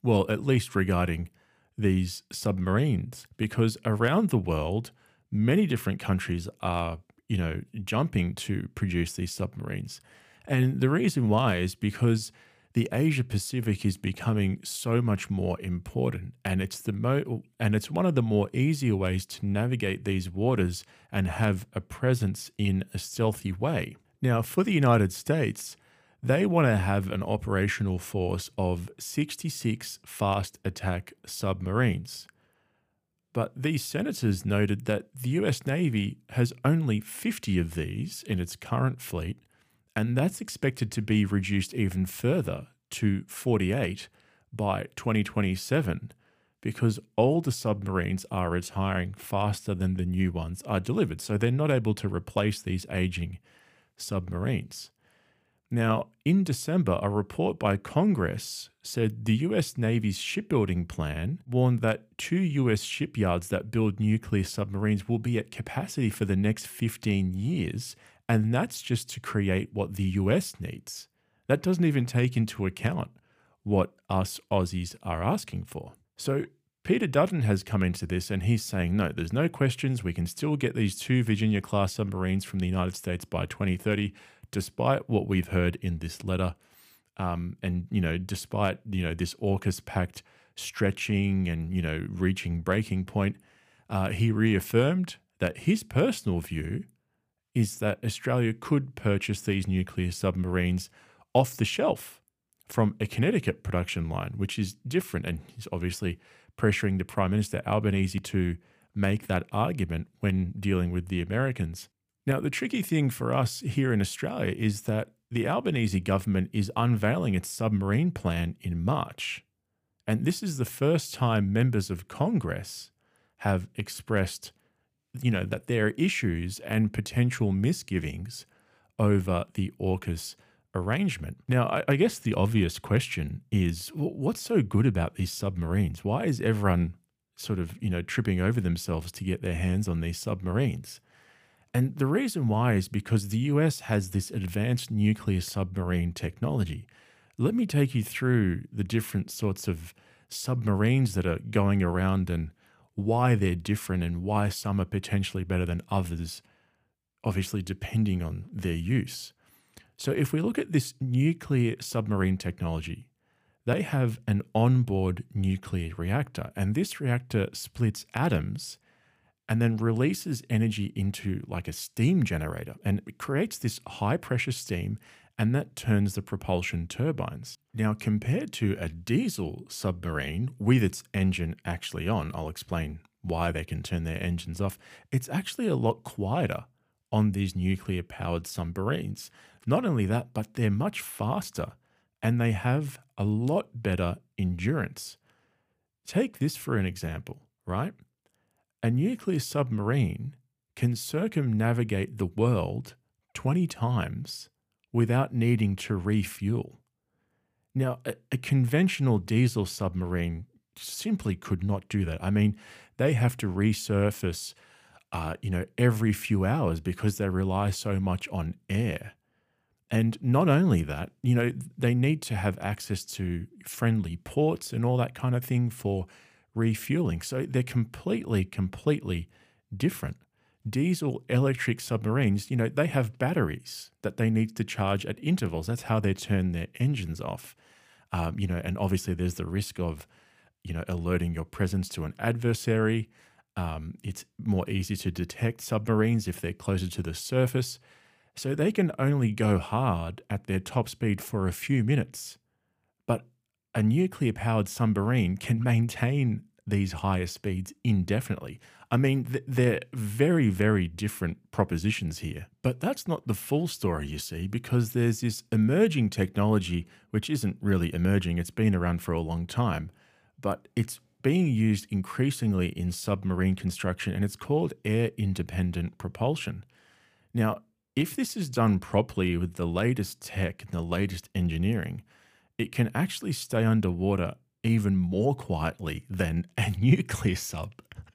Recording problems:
none

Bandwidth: 15 kHz